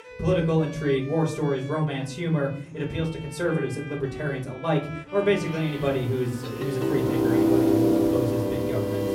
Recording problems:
off-mic speech; far
room echo; slight; dies away in 0.4 s
background music; very loud; throughout; 2 dB above the speech
chatter from many people; faint; throughout; 25 dB below the speech

